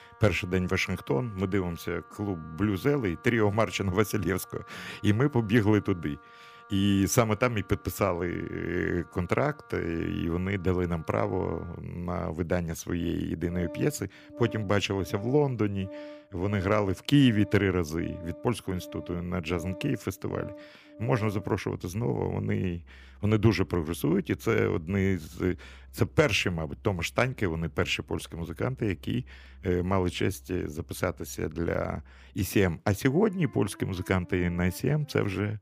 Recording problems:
background music; faint; throughout; 20 dB below the speech

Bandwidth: 15 kHz